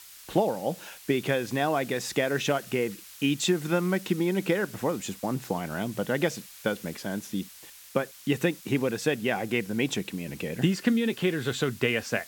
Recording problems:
hiss; noticeable; throughout; 15 dB below the speech

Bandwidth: 17 kHz